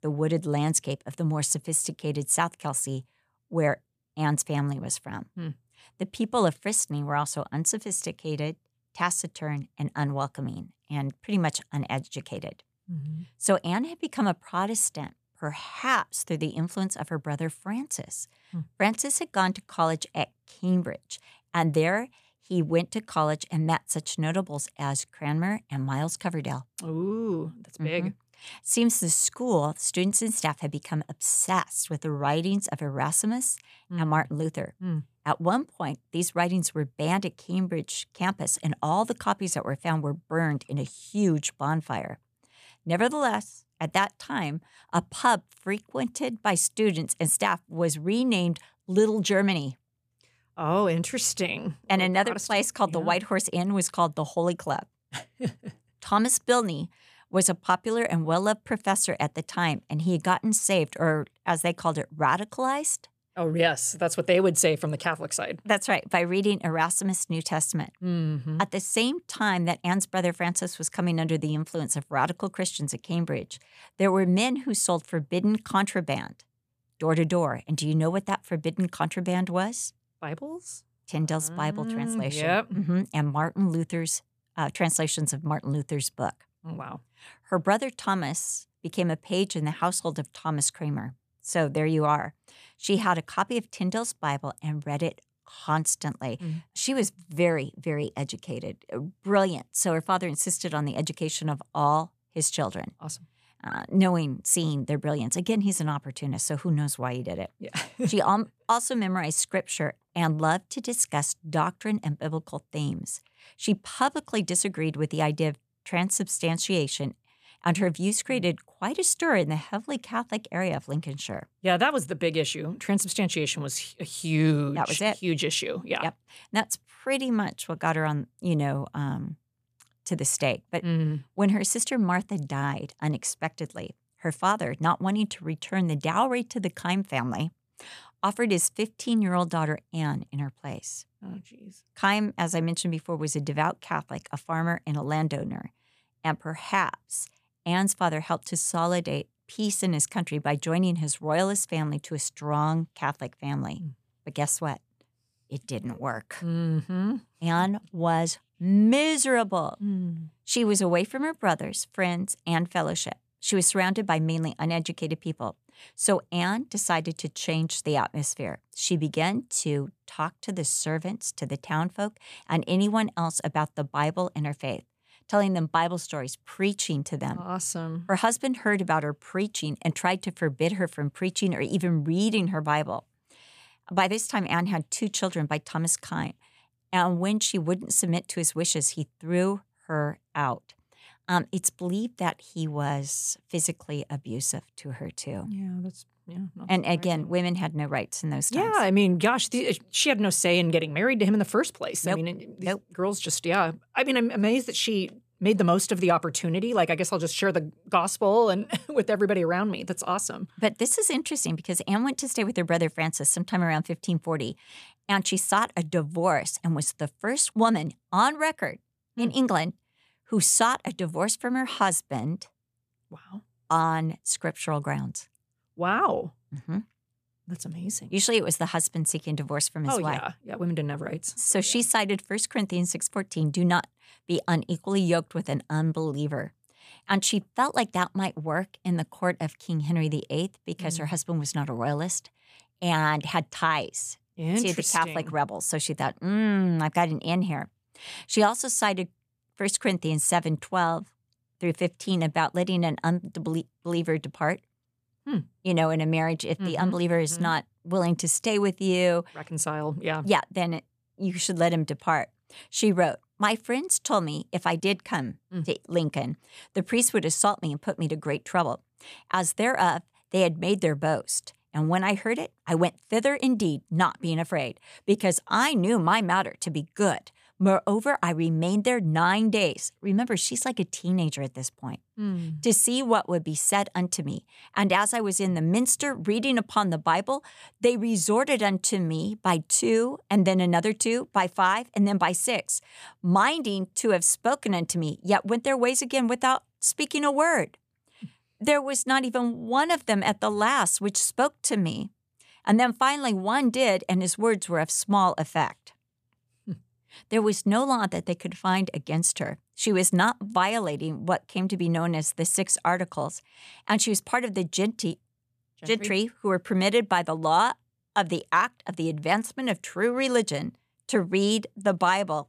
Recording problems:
none

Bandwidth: 14.5 kHz